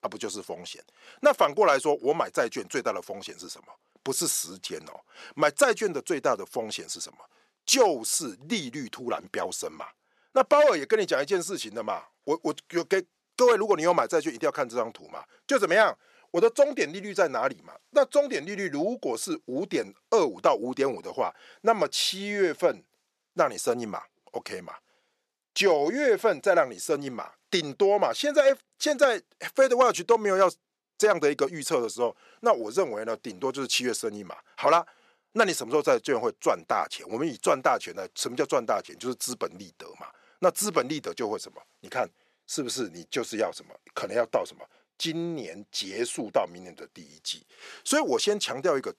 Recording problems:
thin; somewhat; fading below 400 Hz

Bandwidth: 13.5 kHz